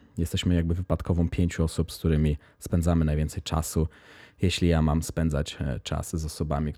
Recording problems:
none

